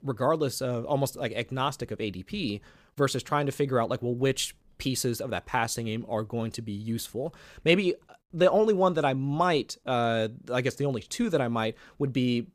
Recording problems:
none

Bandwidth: 15 kHz